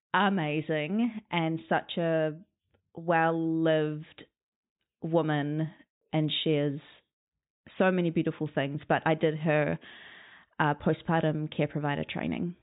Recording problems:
high frequencies cut off; severe; nothing above 4 kHz

